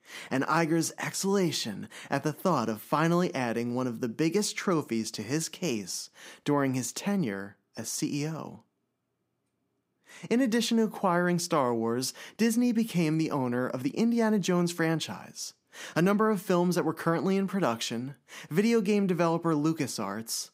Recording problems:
none

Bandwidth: 15.5 kHz